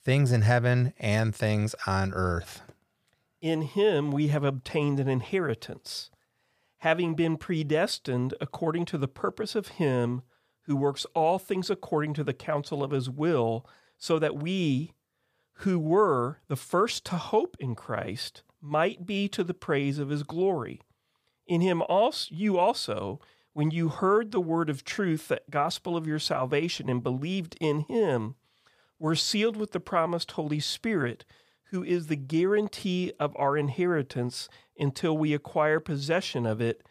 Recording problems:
none

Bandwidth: 15 kHz